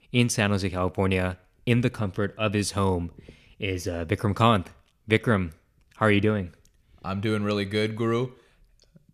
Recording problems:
none

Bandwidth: 14.5 kHz